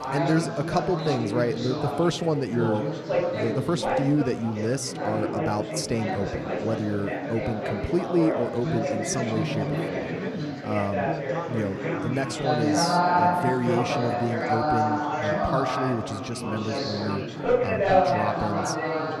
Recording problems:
chatter from many people; very loud; throughout; 2 dB above the speech

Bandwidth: 14.5 kHz